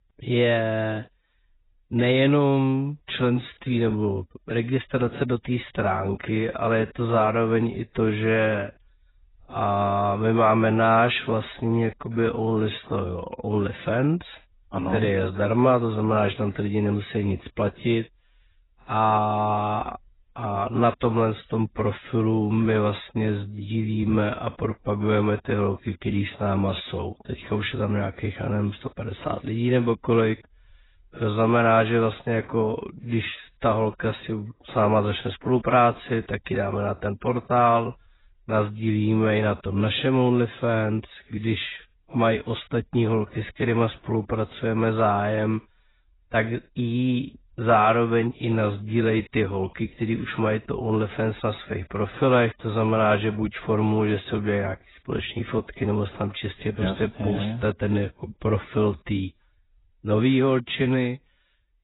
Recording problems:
garbled, watery; badly; nothing above 4 kHz
wrong speed, natural pitch; too slow; 0.6 times normal speed

